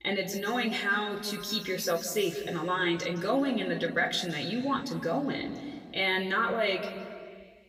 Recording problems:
off-mic speech; far
room echo; slight; dies away in 1.9 s

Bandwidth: 15.5 kHz